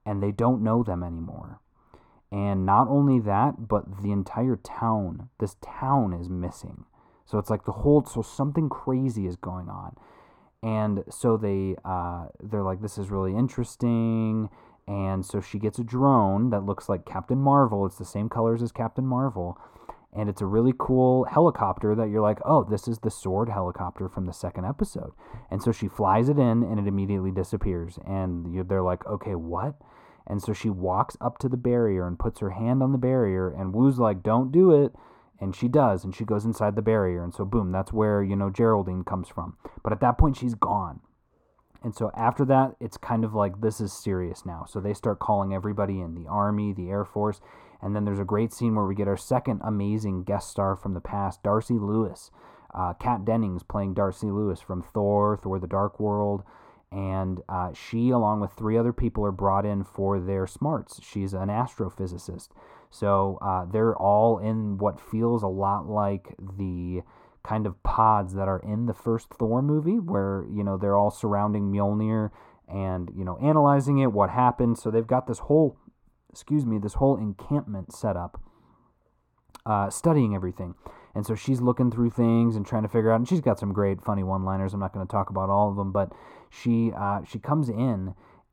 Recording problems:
muffled; very; fading above 1.5 kHz

